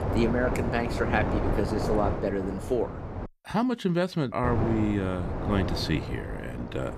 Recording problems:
wind noise on the microphone; heavy; until 3.5 s and from 4.5 s on; 4 dB below the speech

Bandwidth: 14.5 kHz